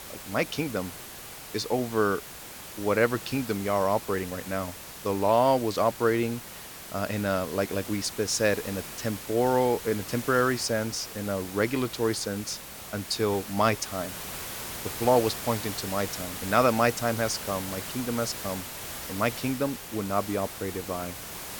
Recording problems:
hiss; loud; throughout; 9 dB below the speech

